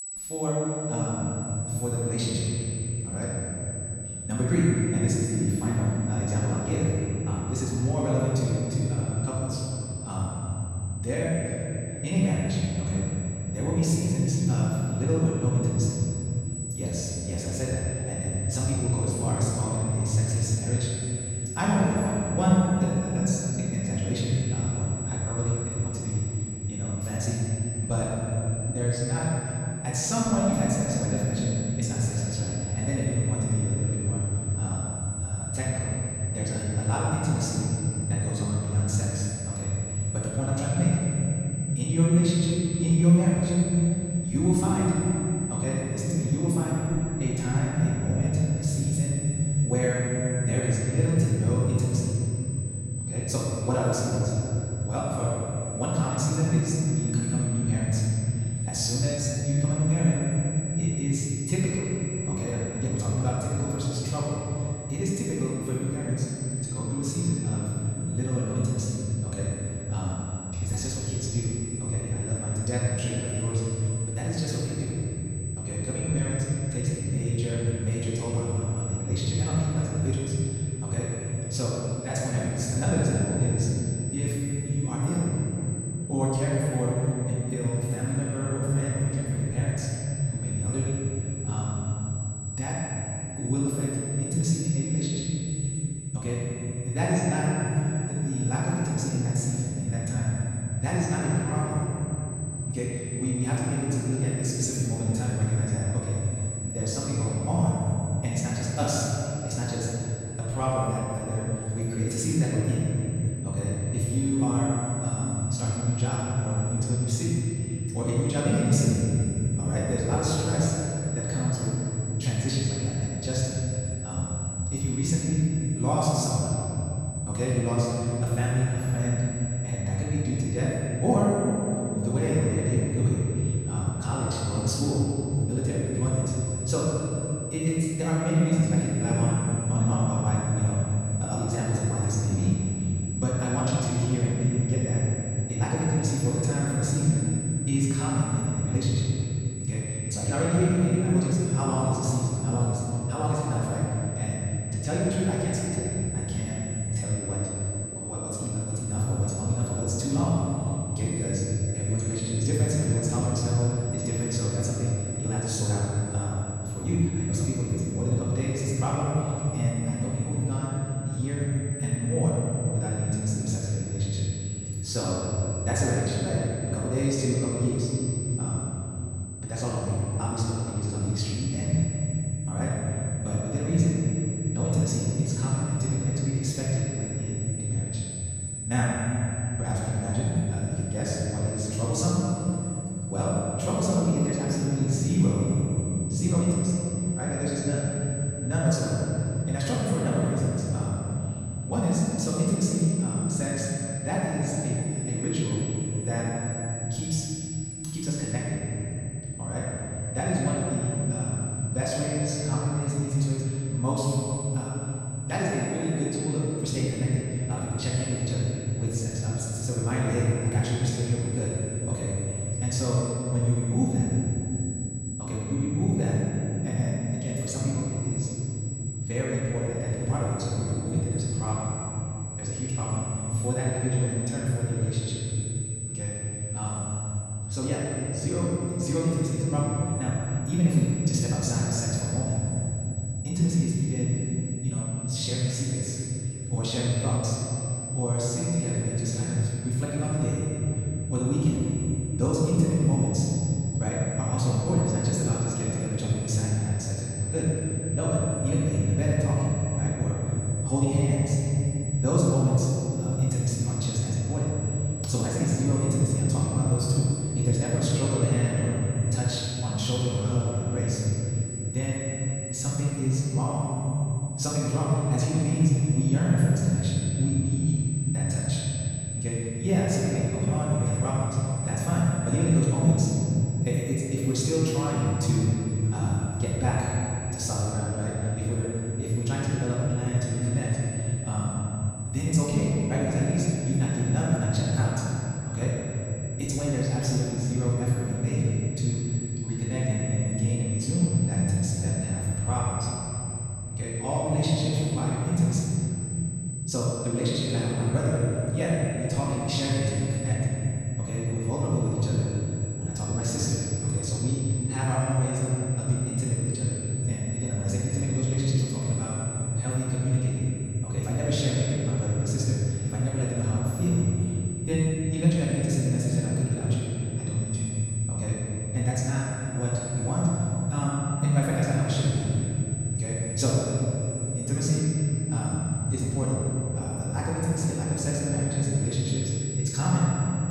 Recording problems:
room echo; strong; dies away in 3 s
off-mic speech; far
wrong speed, natural pitch; too fast; 1.8 times normal speed
high-pitched whine; loud; throughout; 8 kHz, 10 dB below the speech

